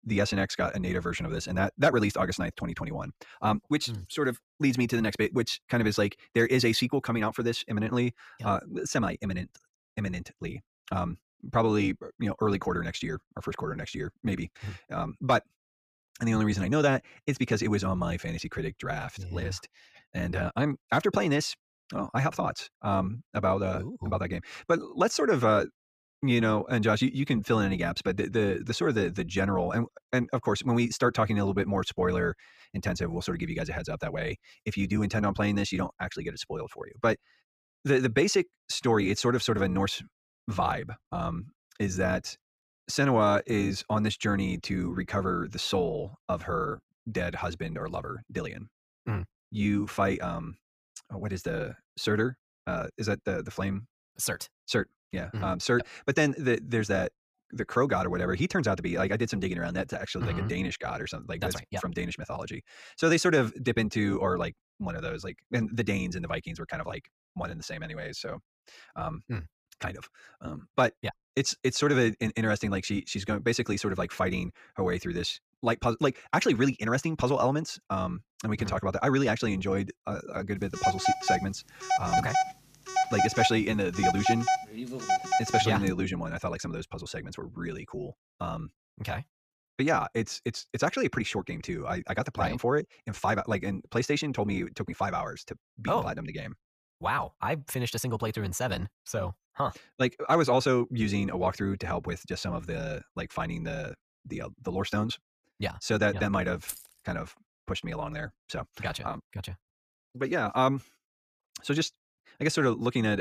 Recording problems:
wrong speed, natural pitch; too fast; 1.5 times normal speed
phone ringing; loud; from 1:21 to 1:26; peak 3 dB above the speech
jangling keys; noticeable; at 1:47; peak 10 dB below the speech
abrupt cut into speech; at the end

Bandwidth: 14.5 kHz